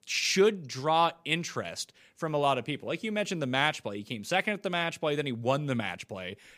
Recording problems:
none

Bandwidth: 15 kHz